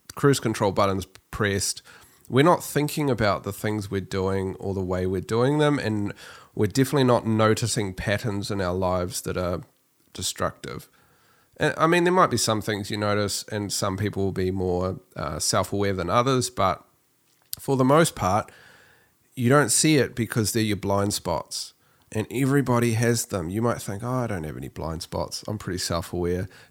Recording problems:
none

